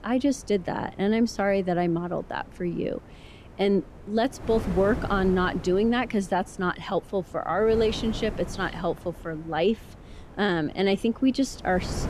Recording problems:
wind noise on the microphone; occasional gusts; 20 dB below the speech

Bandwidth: 14.5 kHz